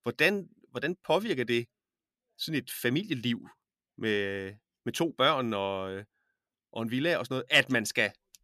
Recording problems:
none

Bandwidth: 14 kHz